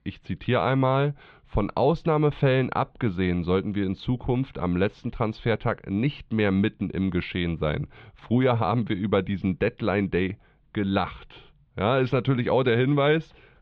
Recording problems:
muffled; very; fading above 3.5 kHz

